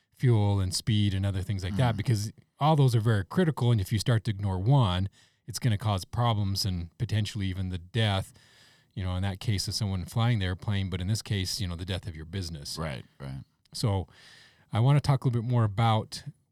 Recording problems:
none

